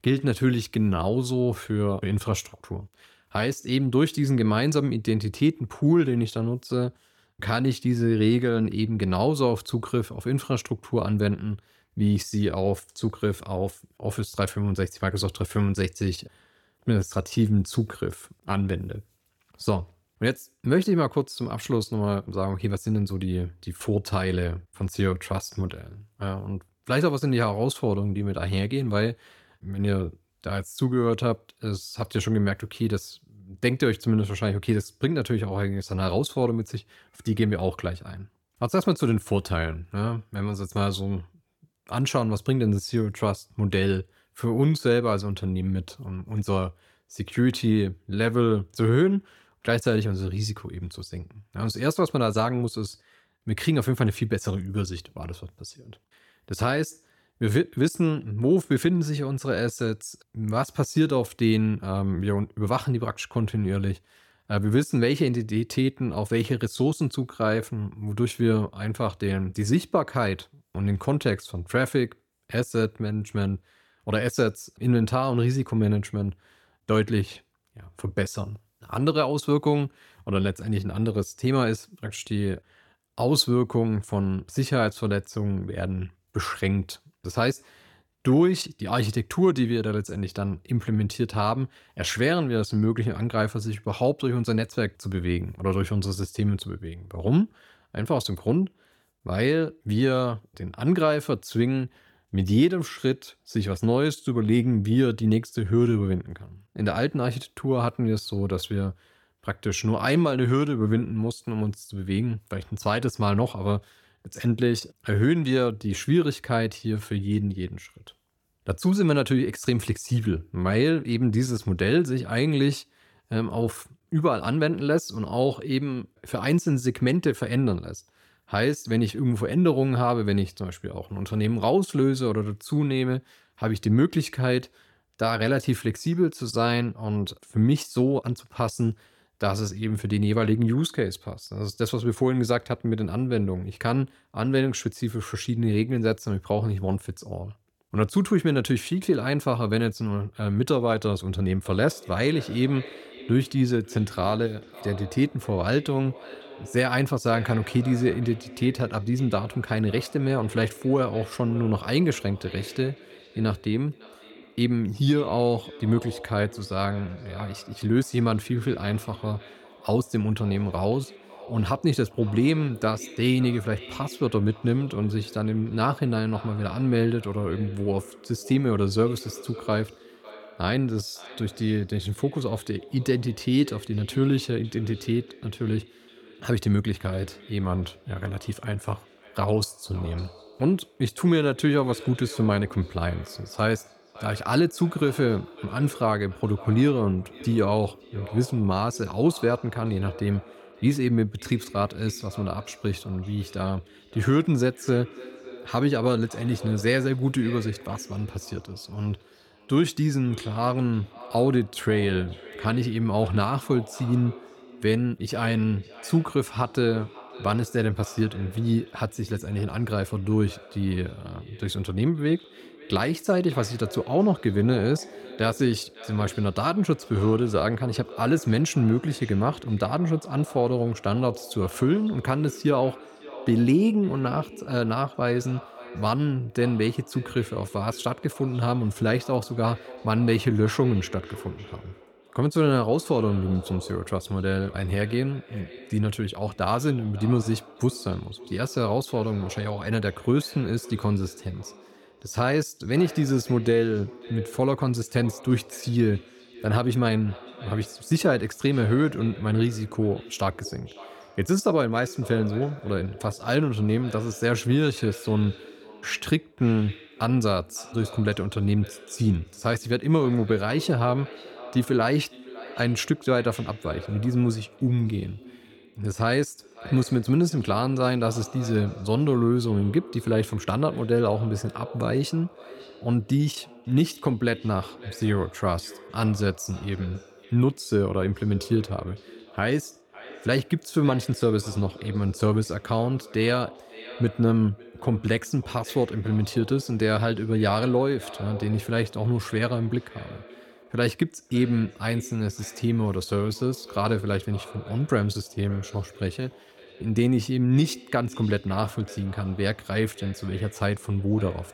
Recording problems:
echo of what is said; faint; from 2:32 on; 560 ms later, 20 dB below the speech

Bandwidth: 18 kHz